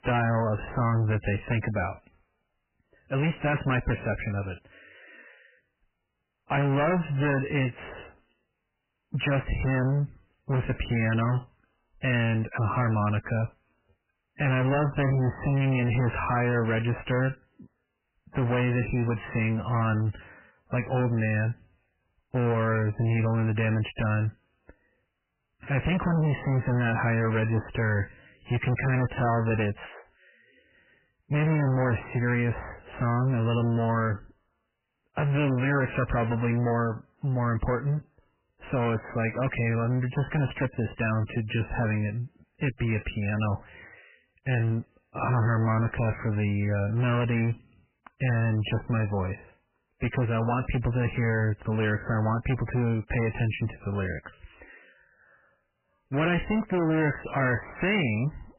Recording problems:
distortion; heavy; 22% of the sound clipped
garbled, watery; badly; nothing above 3 kHz

